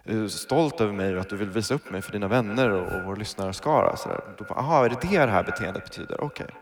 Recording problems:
echo of what is said; noticeable; throughout; 150 ms later, 15 dB below the speech

